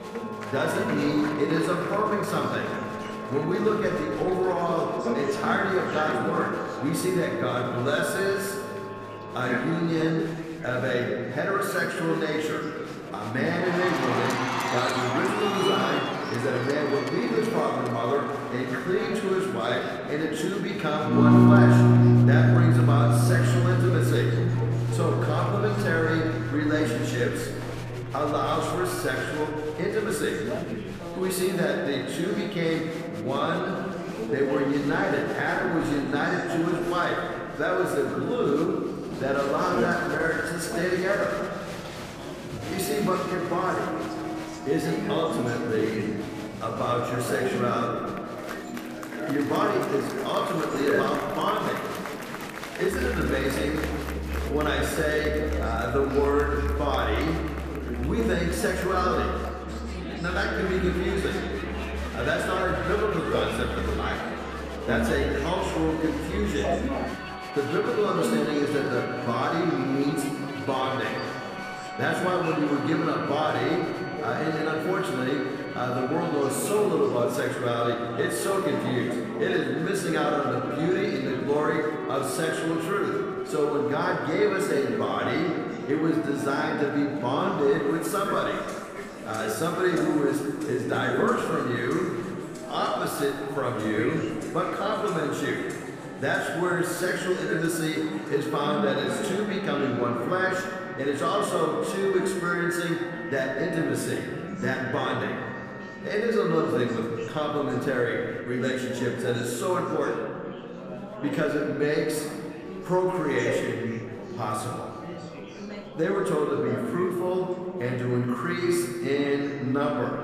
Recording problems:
room echo; noticeable; dies away in 1.8 s
off-mic speech; somewhat distant
background music; loud; throughout; 4 dB below the speech
chatter from many people; loud; throughout; 9 dB below the speech

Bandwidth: 14.5 kHz